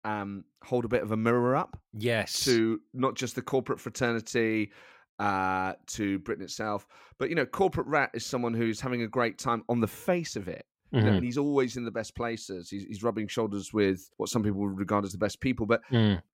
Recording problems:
none

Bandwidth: 16.5 kHz